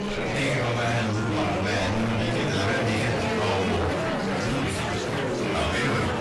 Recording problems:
distortion; heavy; 7 dB below the speech
off-mic speech; far
room echo; slight; dies away in 0.3 s
garbled, watery; slightly; nothing above 11 kHz
chatter from many people; loud; throughout; as loud as the speech
background music; noticeable; from 5 s on; 15 dB below the speech
animal sounds; faint; throughout; 20 dB below the speech

